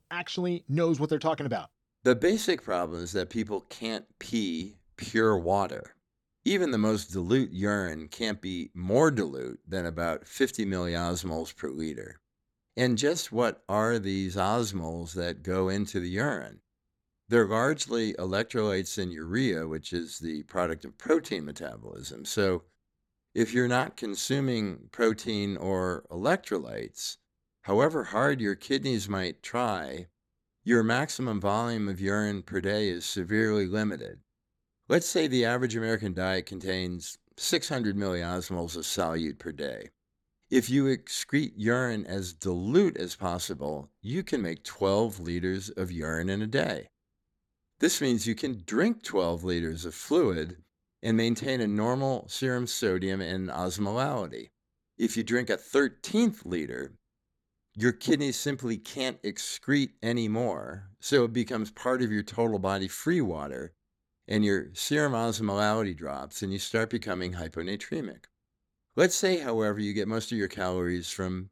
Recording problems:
none

